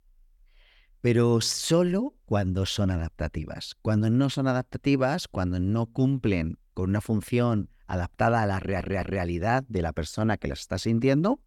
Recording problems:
audio stuttering; at 8.5 s

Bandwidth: 18 kHz